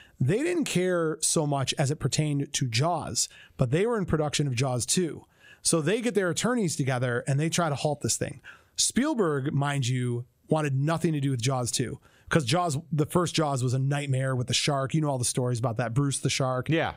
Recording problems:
squashed, flat; somewhat

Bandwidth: 15.5 kHz